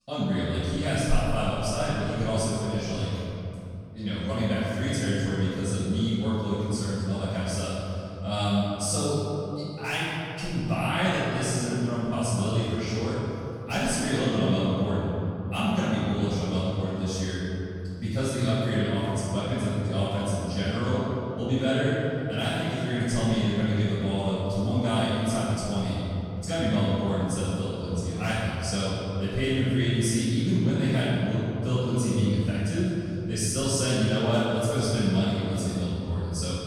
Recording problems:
room echo; strong; dies away in 2.9 s
off-mic speech; far

